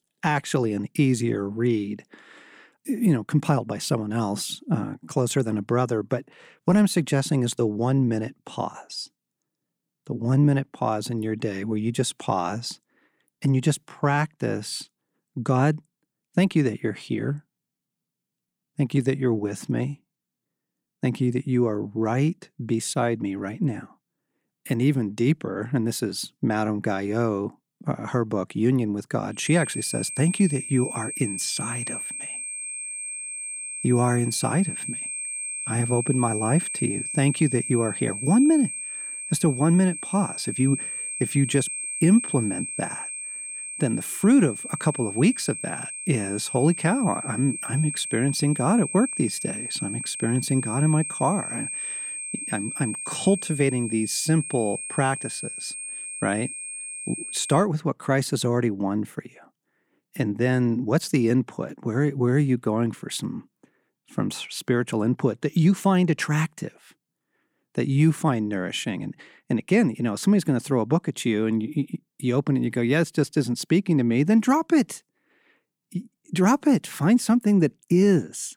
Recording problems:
high-pitched whine; loud; from 29 to 58 s; 8.5 kHz, 6 dB below the speech

